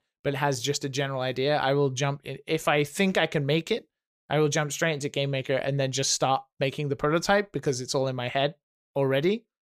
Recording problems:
none

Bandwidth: 15 kHz